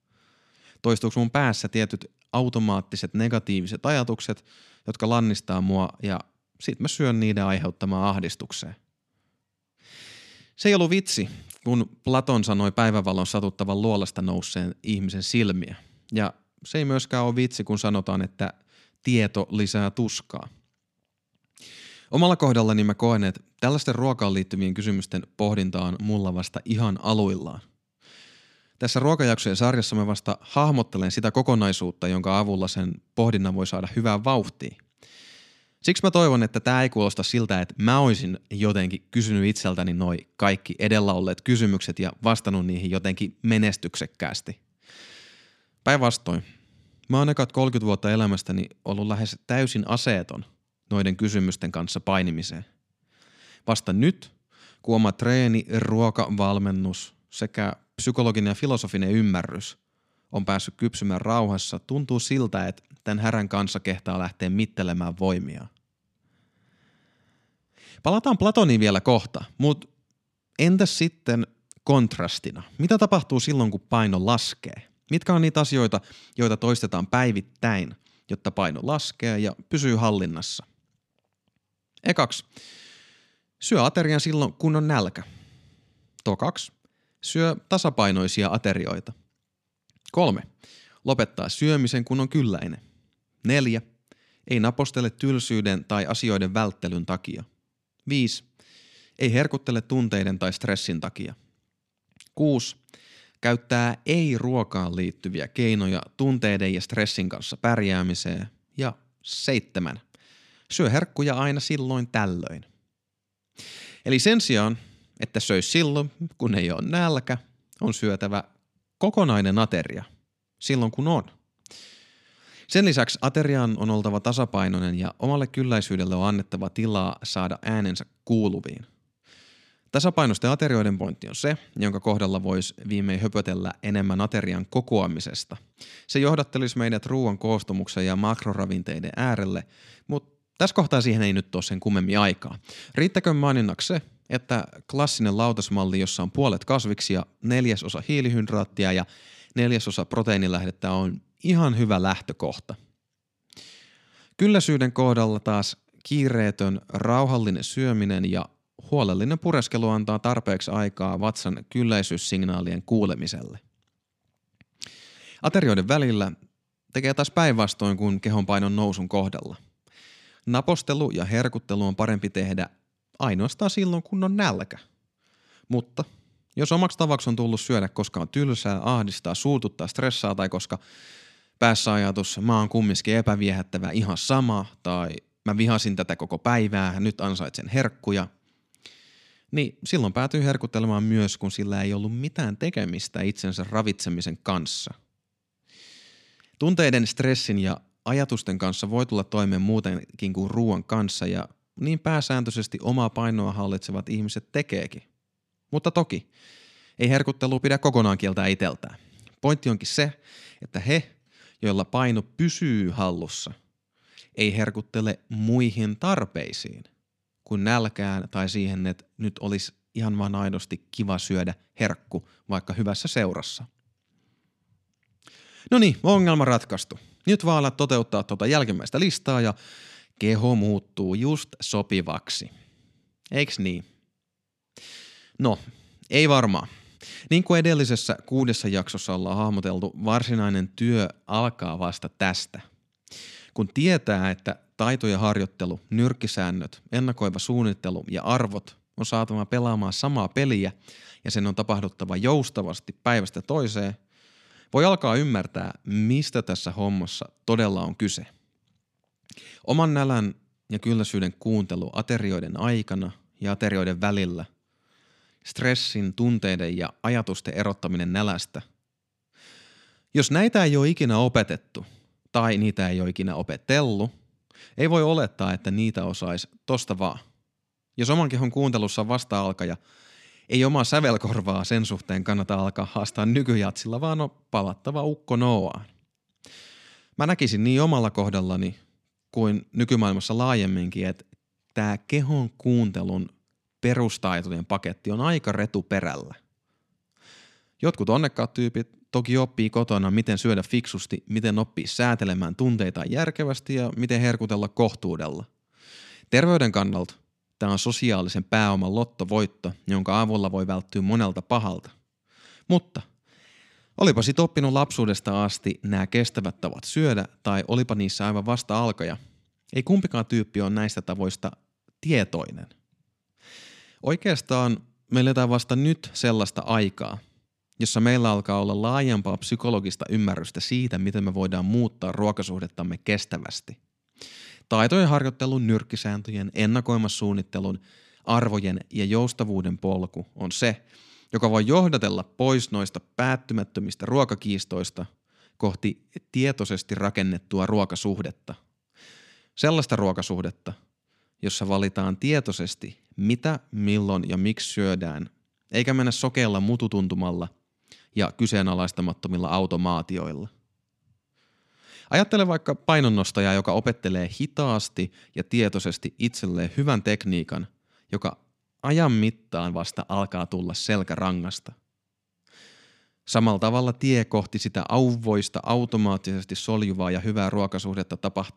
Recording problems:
none

